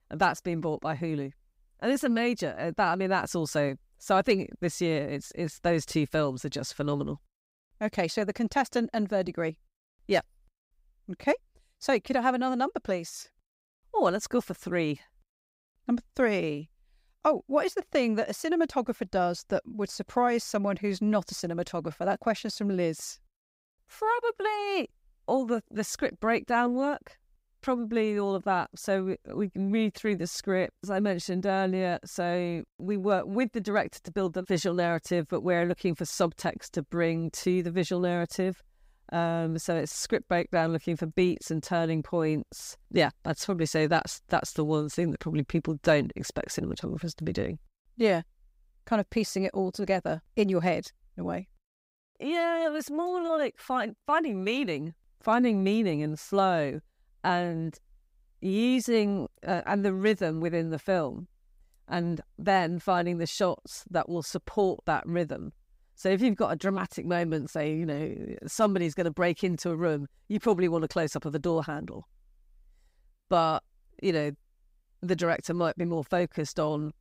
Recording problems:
none

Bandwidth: 15.5 kHz